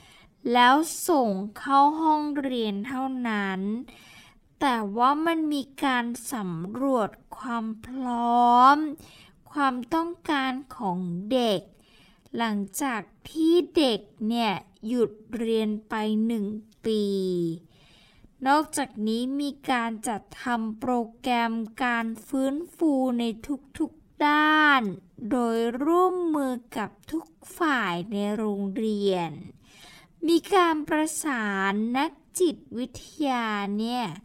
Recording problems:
wrong speed, natural pitch; too slow; 0.5 times normal speed

